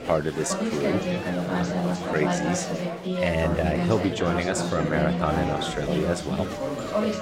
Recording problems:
chatter from many people; very loud; throughout; as loud as the speech

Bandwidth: 16.5 kHz